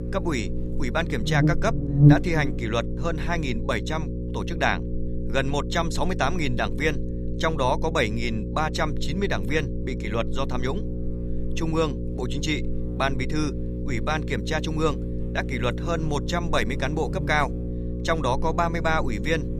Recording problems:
electrical hum; loud; throughout; 60 Hz, 9 dB below the speech

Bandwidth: 14.5 kHz